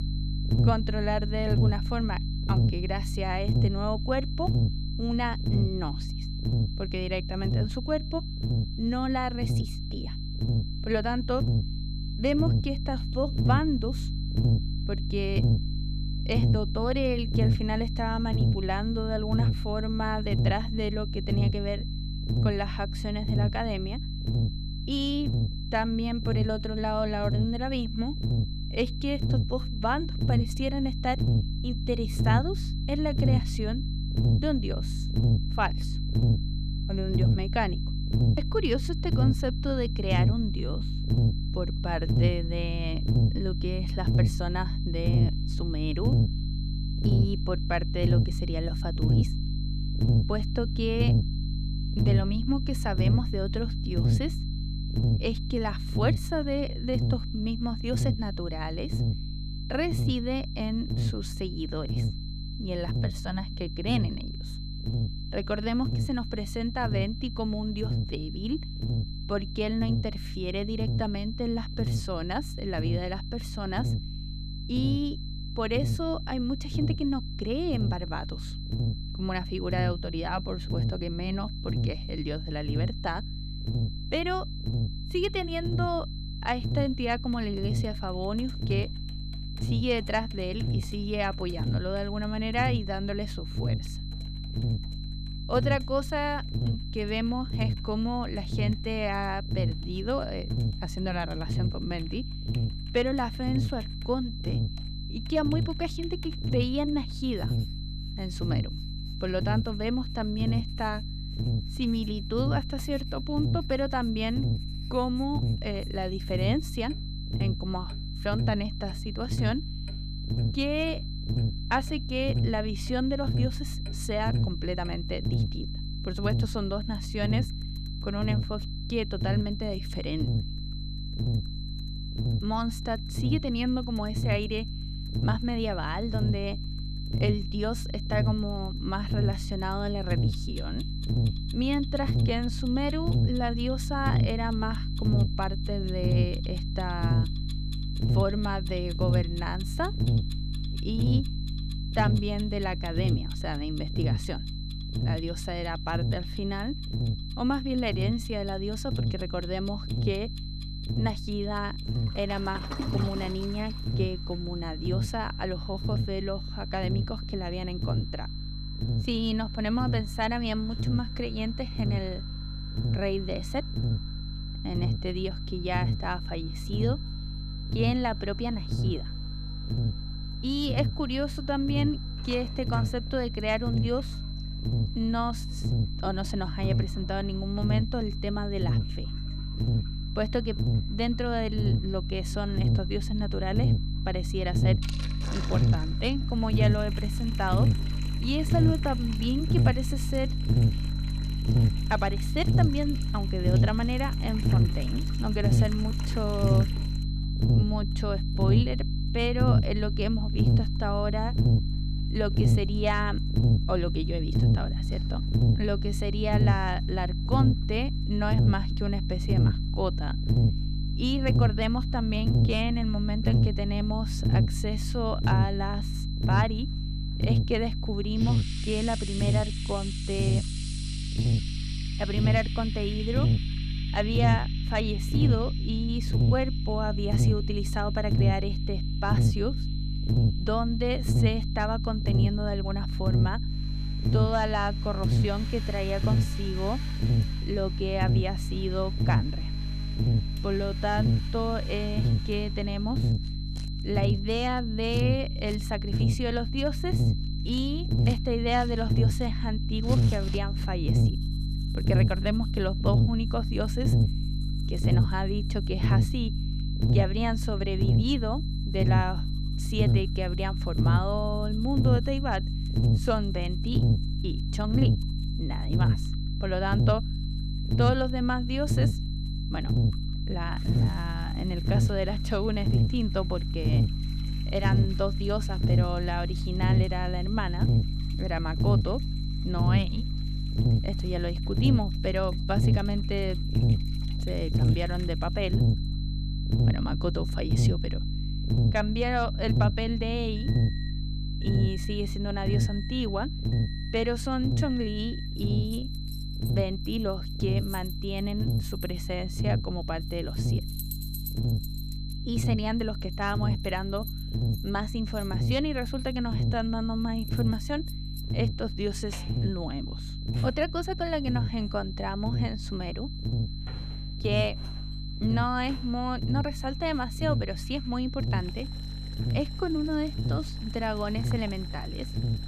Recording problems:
electrical hum; loud; throughout; 50 Hz, 8 dB below the speech
high-pitched whine; noticeable; throughout; 4 kHz, 10 dB below the speech
household noises; noticeable; from 1:27 on; 20 dB below the speech

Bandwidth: 14.5 kHz